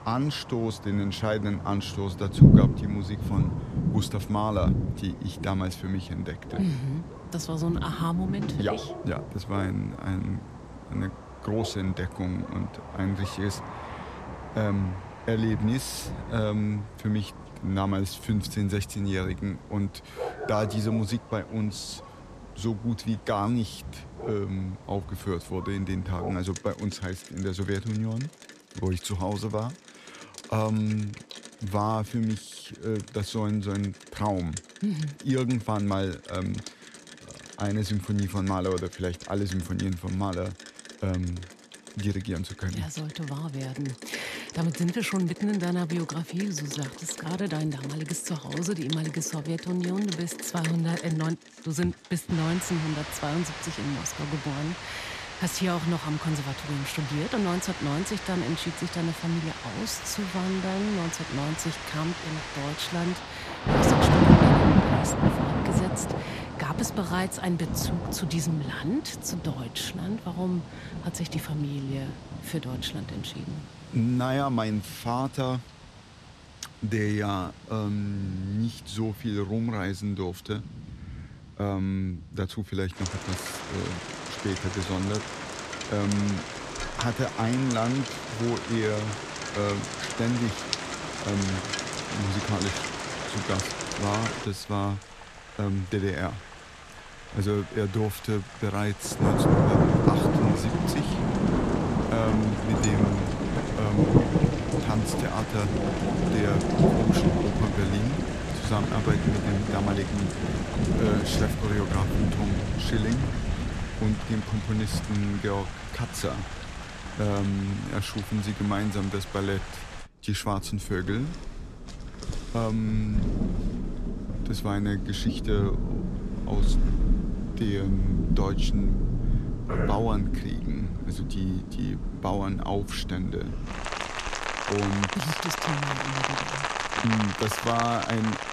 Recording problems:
rain or running water; very loud; throughout; 1 dB above the speech

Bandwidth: 14 kHz